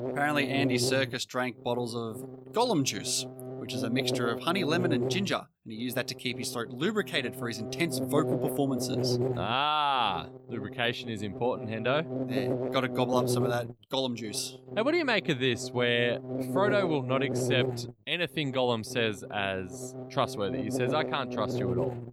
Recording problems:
electrical hum; loud; throughout; 50 Hz, 7 dB below the speech

